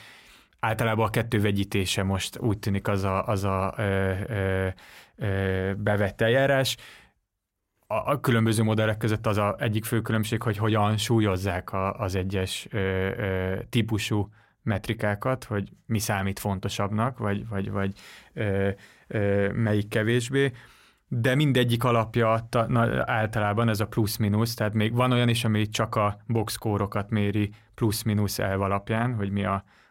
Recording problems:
none

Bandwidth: 16 kHz